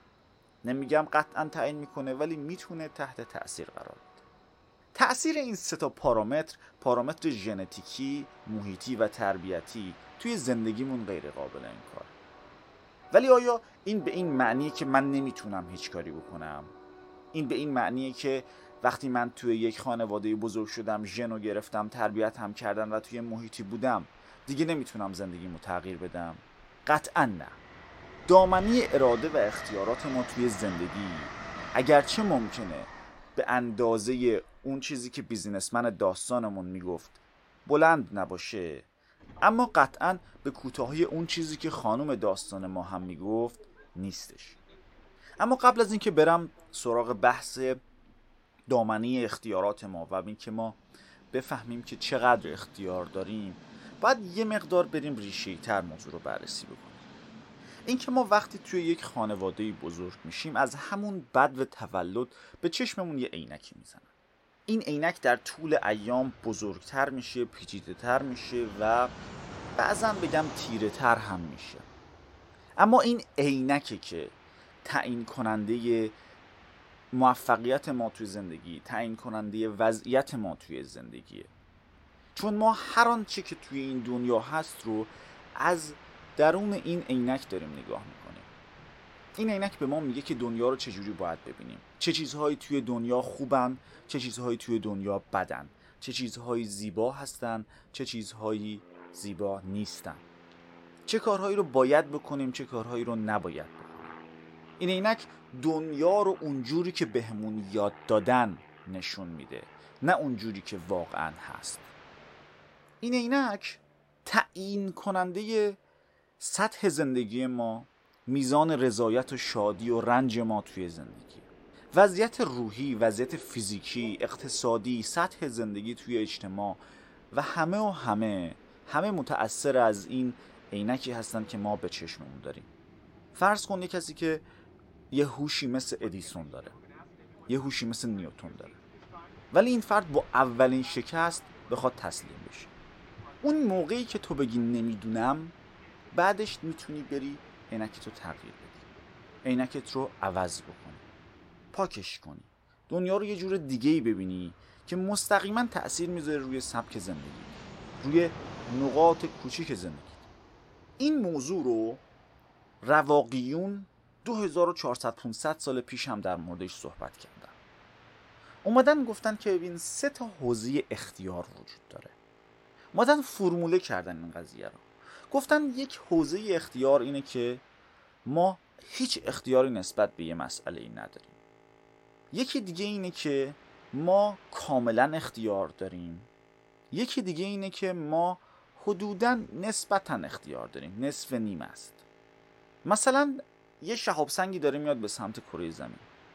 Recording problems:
train or aircraft noise; faint; throughout; 20 dB below the speech

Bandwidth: 16 kHz